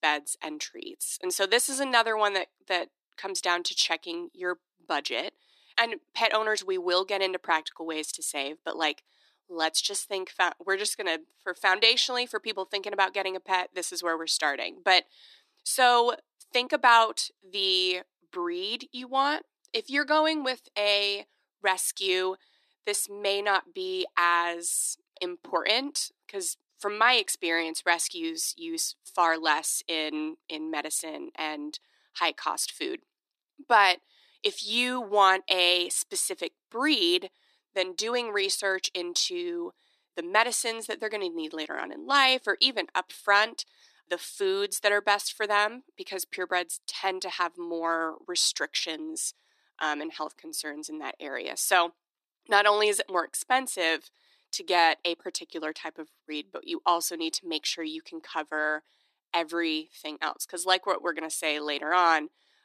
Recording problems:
thin; very; fading below 300 Hz

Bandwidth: 13.5 kHz